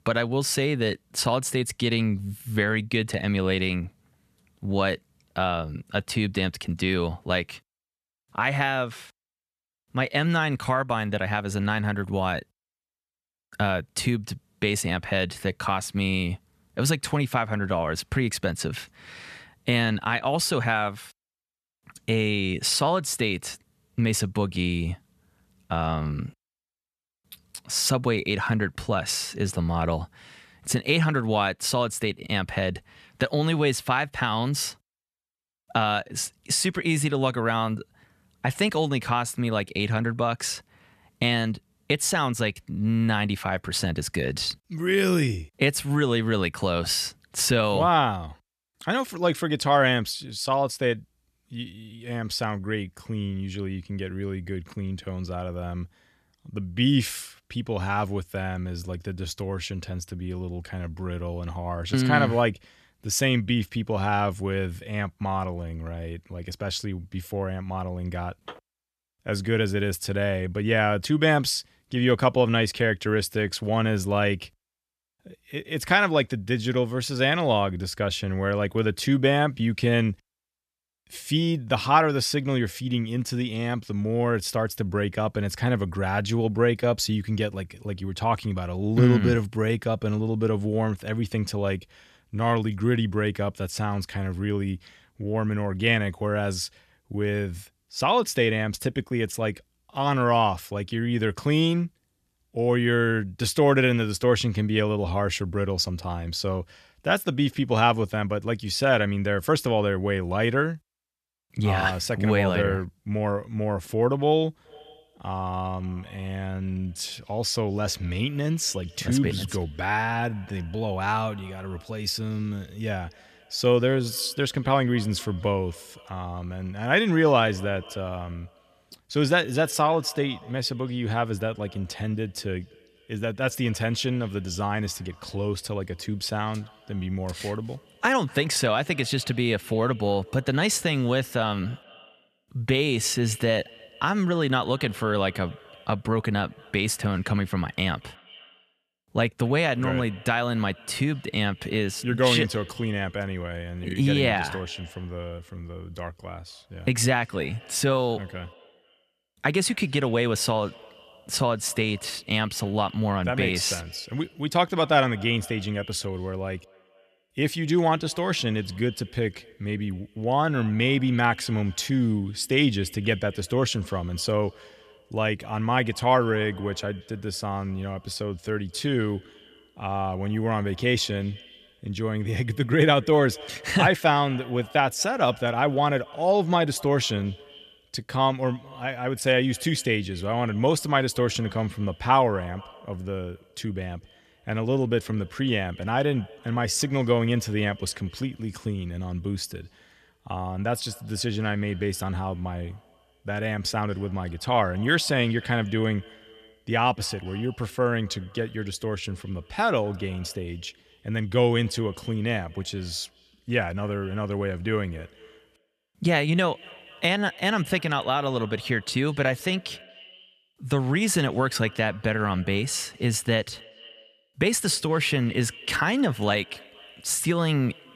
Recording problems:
echo of what is said; faint; from 1:55 on; 230 ms later, 25 dB below the speech

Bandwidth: 14 kHz